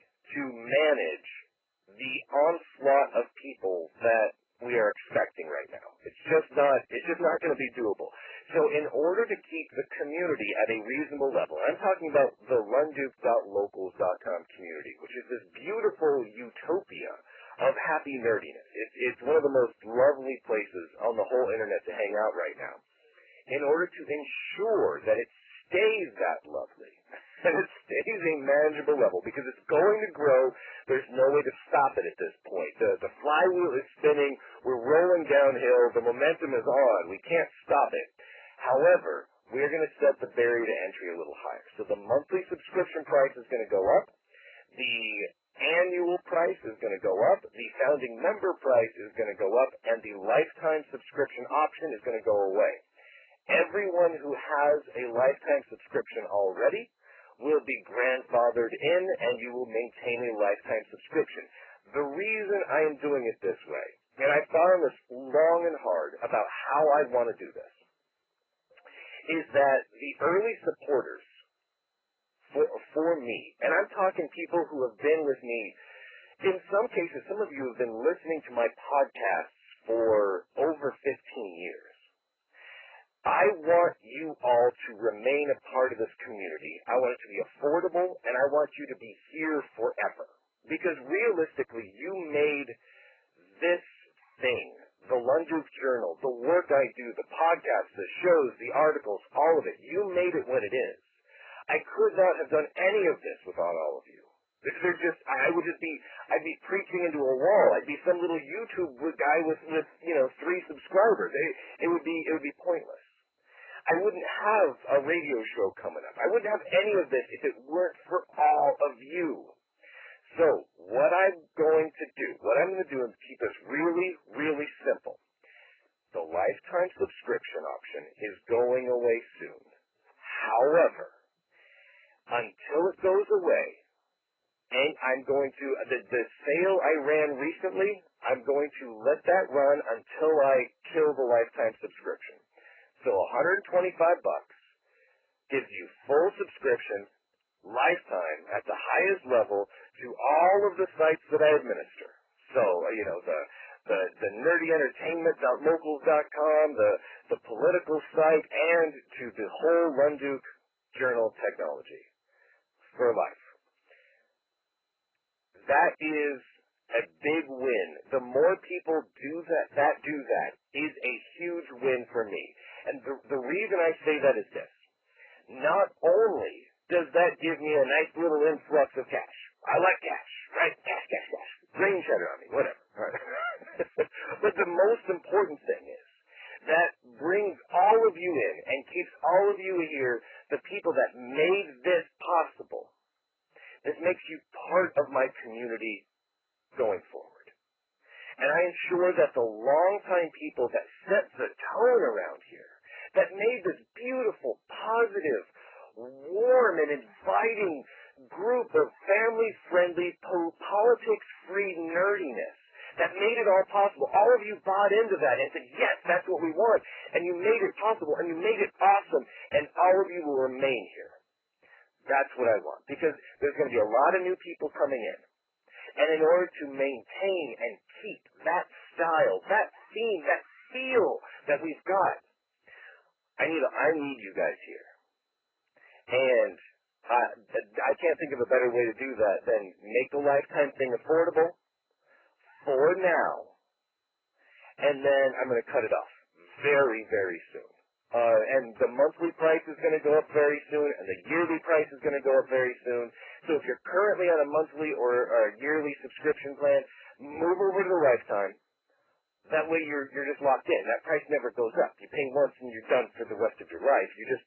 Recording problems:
phone-call audio; poor line; nothing above 3 kHz
garbled, watery; badly
distortion; slight; 5% of the sound clipped

